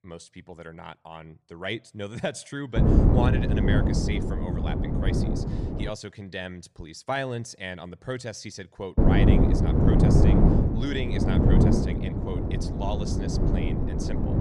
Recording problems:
wind noise on the microphone; heavy; from 3 to 6 s and from 9 s on; 4 dB above the speech

